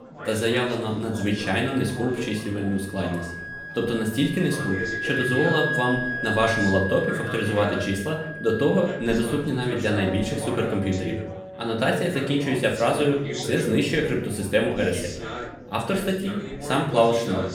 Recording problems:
off-mic speech; far
room echo; slight; dies away in 0.5 s
background music; loud; throughout; 7 dB below the speech
chatter from many people; noticeable; throughout; 10 dB below the speech

